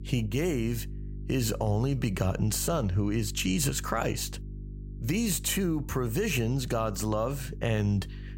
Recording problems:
electrical hum; faint; throughout; 50 Hz, 20 dB below the speech

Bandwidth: 16 kHz